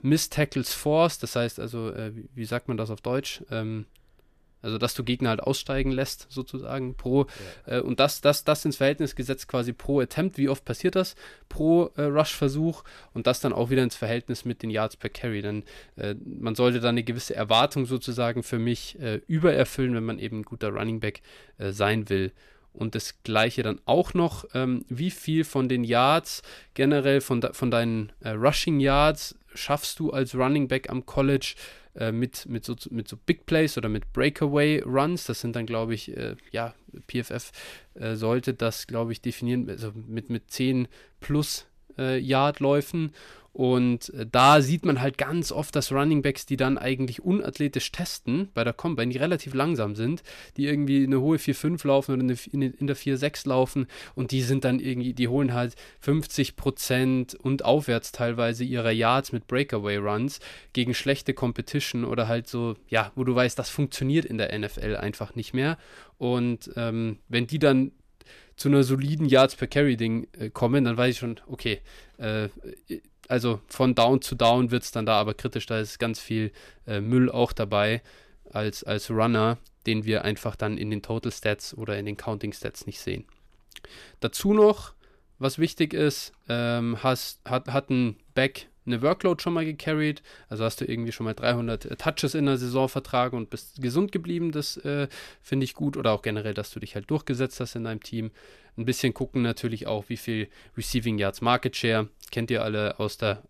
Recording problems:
none

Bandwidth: 14.5 kHz